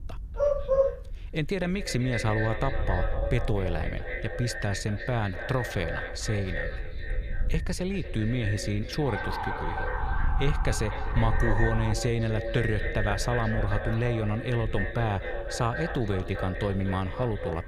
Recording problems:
echo of what is said; strong; throughout; 250 ms later, 7 dB below the speech
wind noise on the microphone; occasional gusts; 25 dB below the speech
dog barking; loud; at 0.5 s; peak 5 dB above the speech
siren; noticeable; from 9 to 12 s; peak 3 dB below the speech

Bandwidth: 14.5 kHz